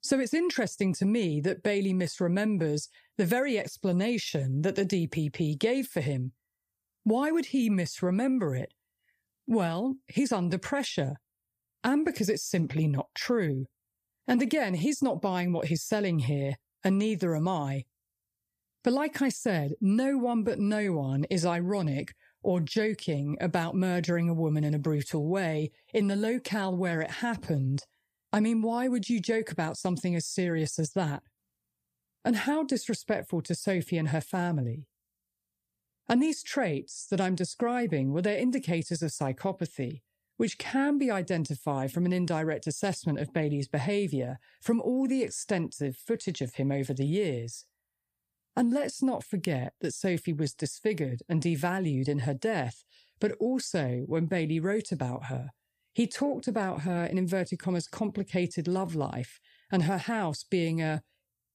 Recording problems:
none

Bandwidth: 15 kHz